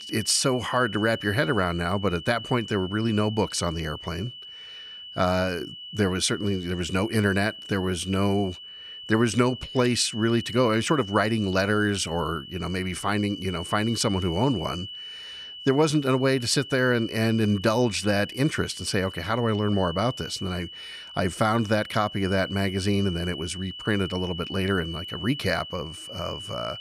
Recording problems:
high-pitched whine; noticeable; throughout; 3 kHz, 10 dB below the speech

